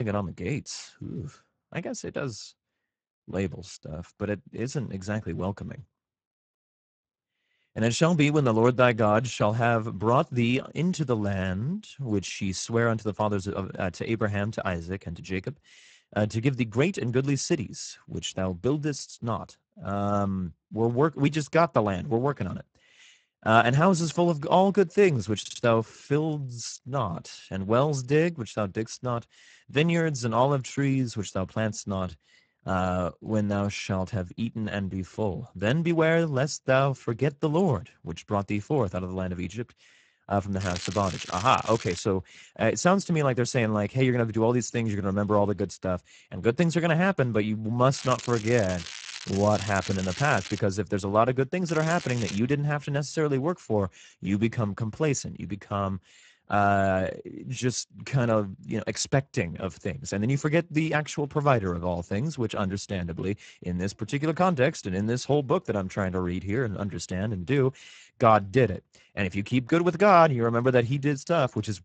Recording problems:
garbled, watery; badly; nothing above 8 kHz
crackling; noticeable; from 41 to 42 s, from 48 to 51 s and at 52 s; 10 dB below the speech
abrupt cut into speech; at the start
audio stuttering; at 25 s

